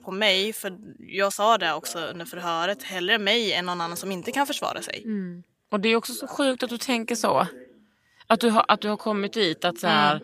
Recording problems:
voice in the background; faint; throughout; 25 dB below the speech

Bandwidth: 15 kHz